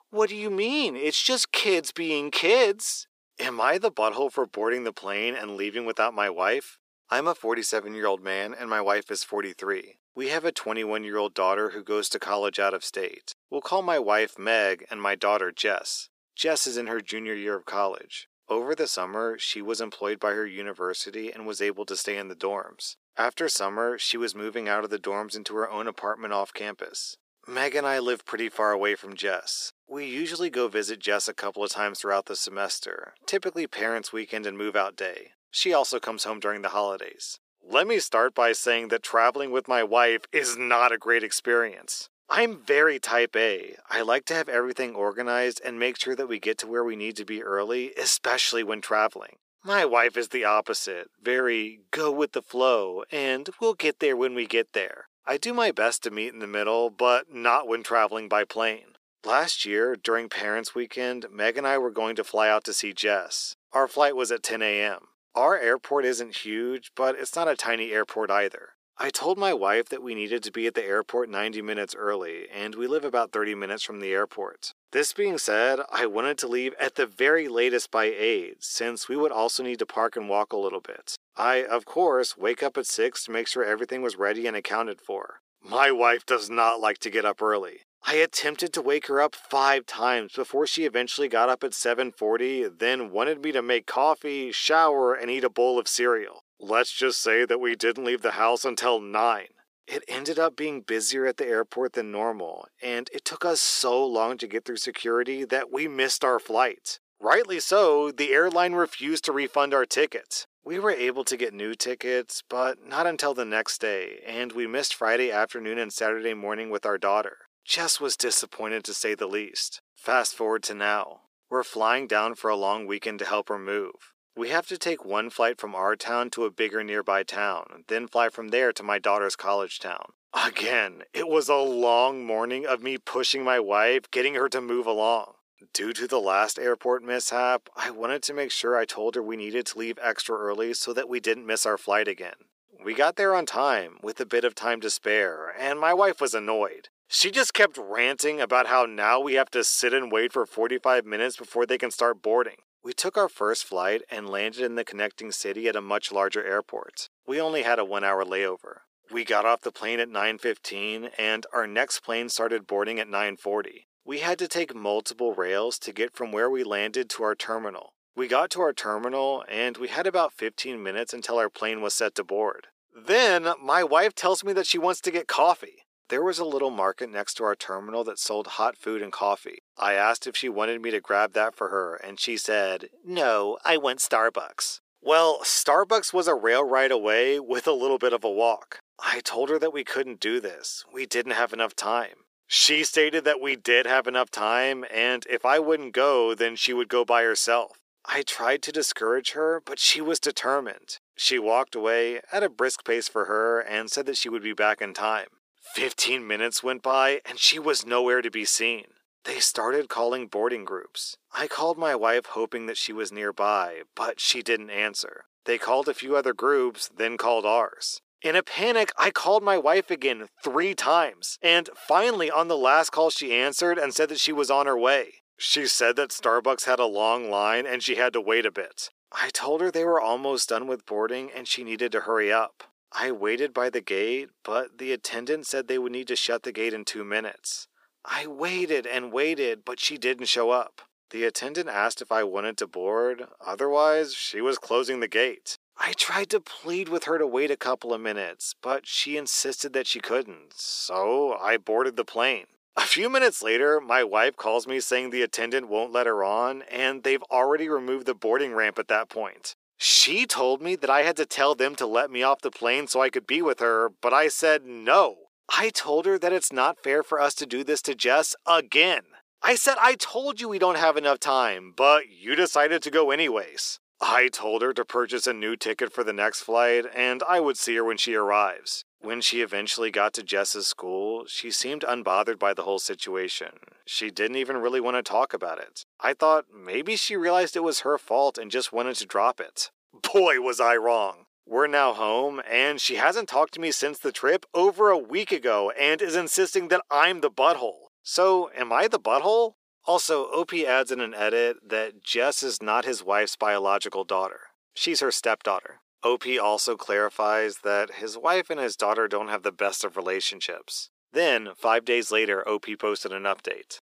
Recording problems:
thin; very; fading below 350 Hz

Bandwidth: 15 kHz